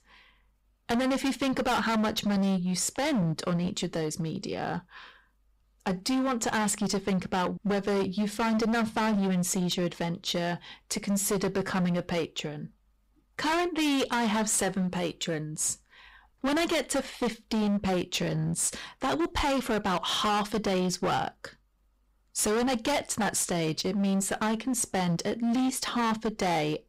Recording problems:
distortion; heavy; 20% of the sound clipped

